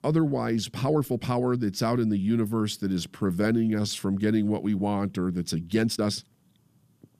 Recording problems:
uneven, jittery; strongly; from 0.5 to 6 s

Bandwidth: 14.5 kHz